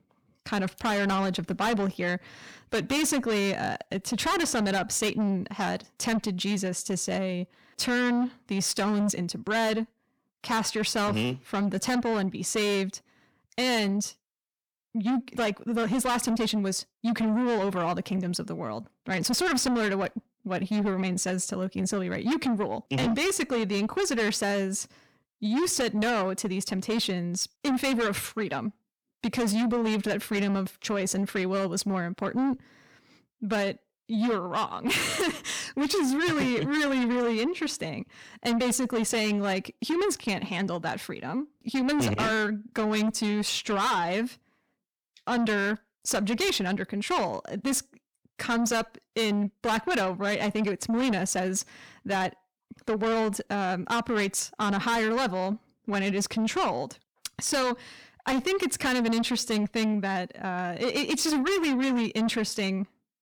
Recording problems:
distortion; heavy; 7 dB below the speech

